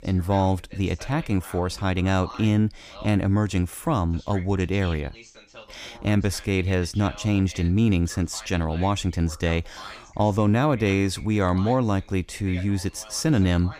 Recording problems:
voice in the background; faint; throughout; 20 dB below the speech

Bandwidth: 15 kHz